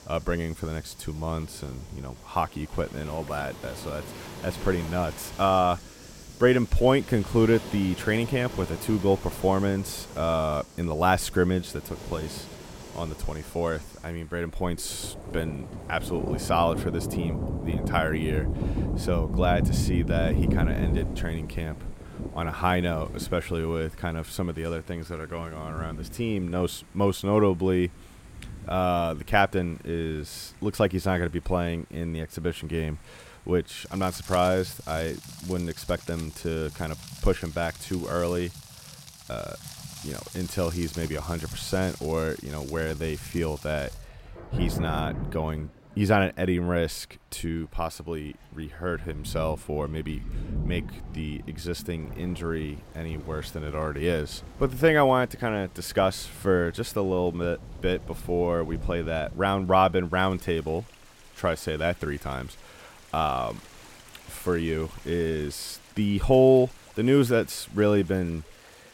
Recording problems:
rain or running water; loud; throughout; 9 dB below the speech

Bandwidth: 16 kHz